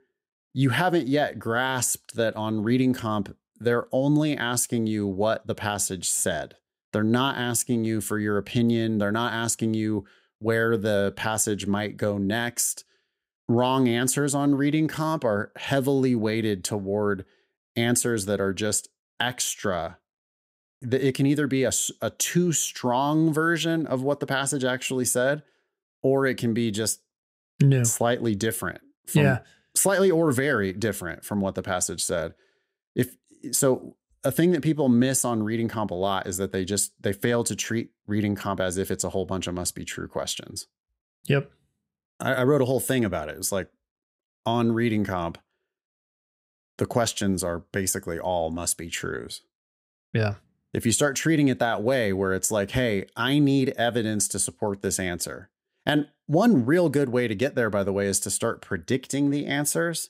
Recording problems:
none

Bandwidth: 15.5 kHz